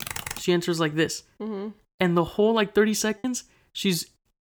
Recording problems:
keyboard typing; noticeable; at the start; peak 6 dB below the speech
choppy; very; at 3 s; 5% of the speech affected

